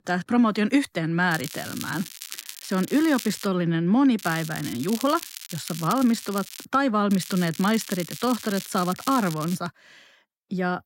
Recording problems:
crackling; noticeable; from 1.5 to 3.5 s, from 4 to 6.5 s and from 7 to 9.5 s; 10 dB below the speech

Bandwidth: 16 kHz